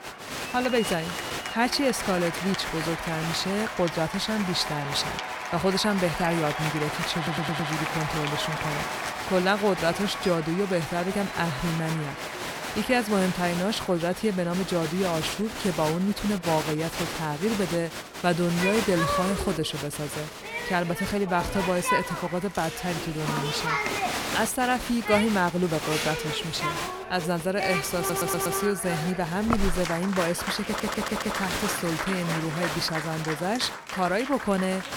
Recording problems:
crowd noise; loud; throughout; 4 dB below the speech
audio stuttering; at 7 s, at 28 s and at 31 s

